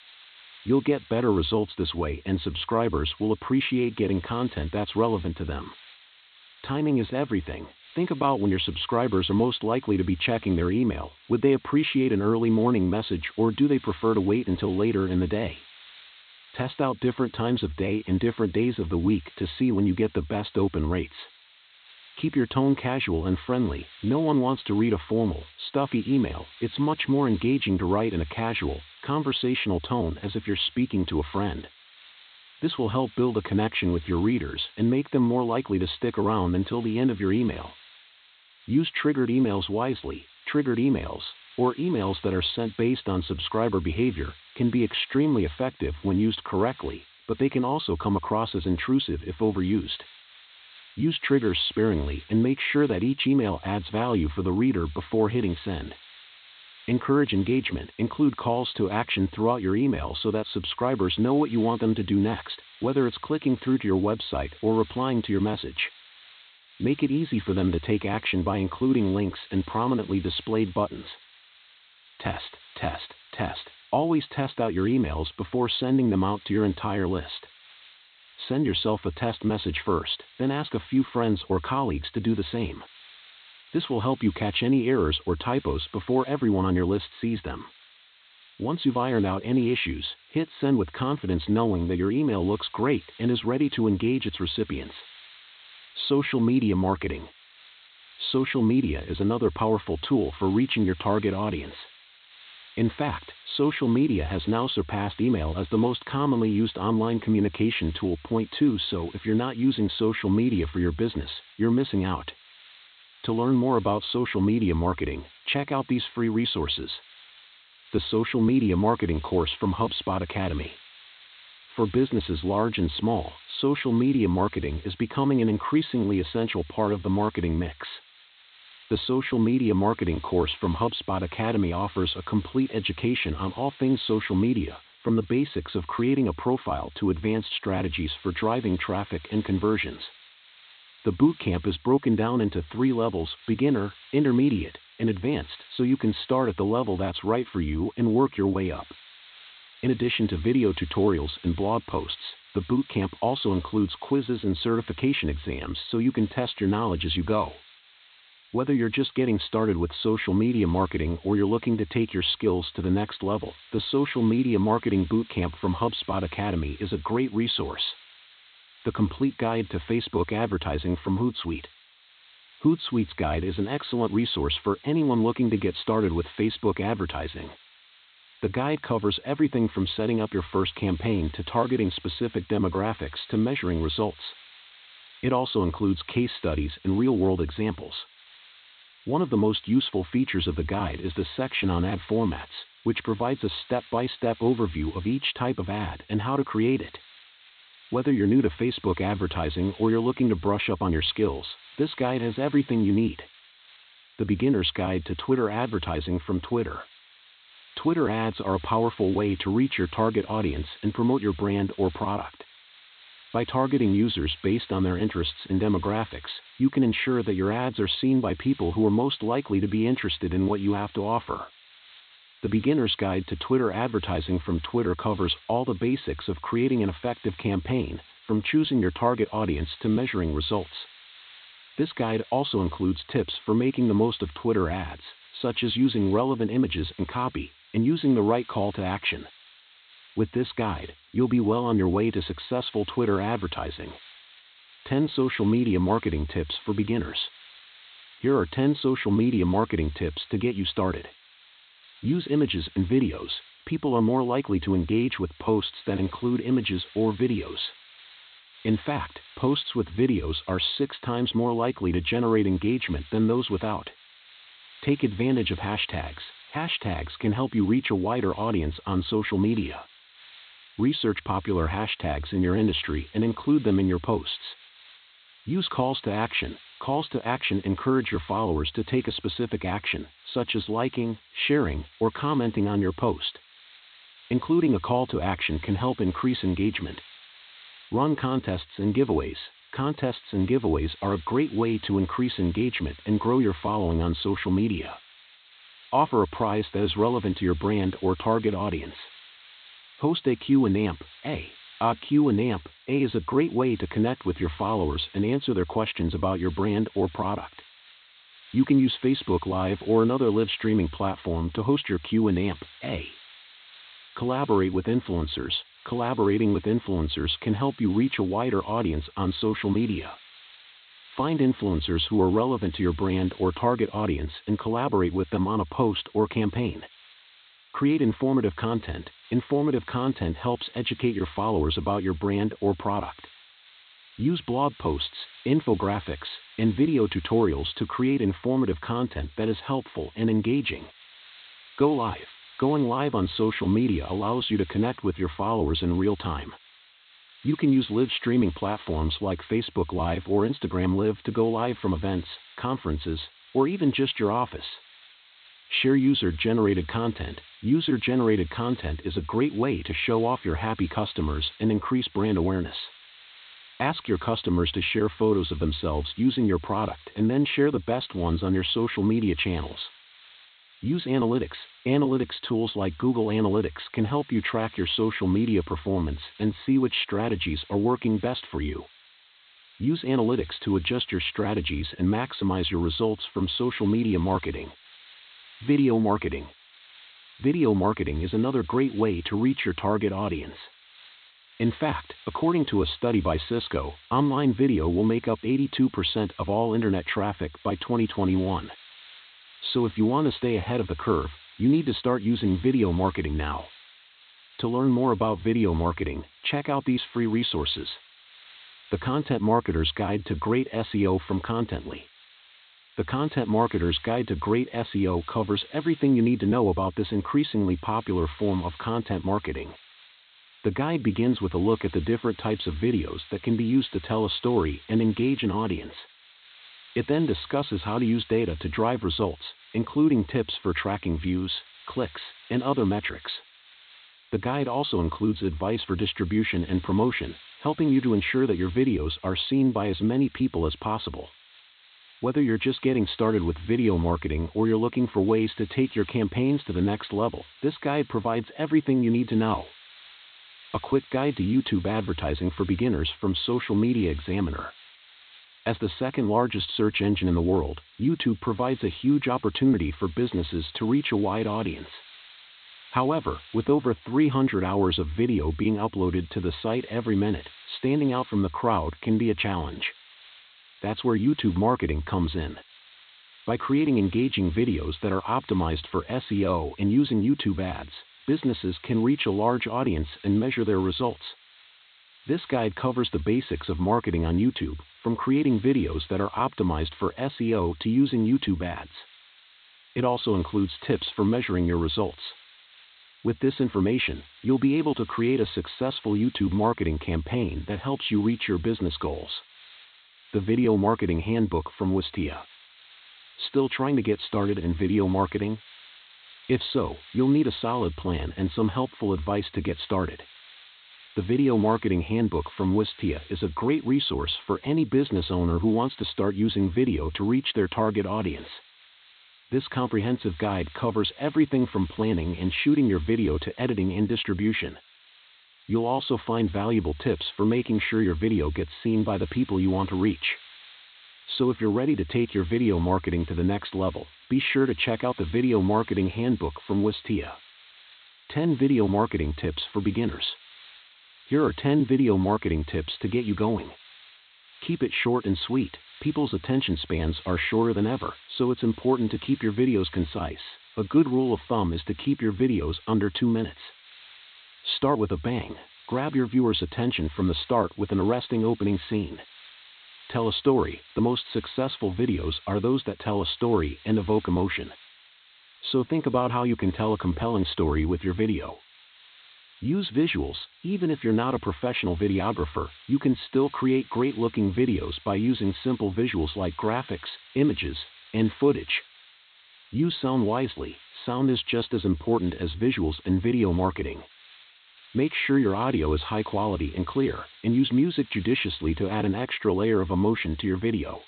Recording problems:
high frequencies cut off; severe; nothing above 4 kHz
hiss; faint; throughout; 25 dB below the speech

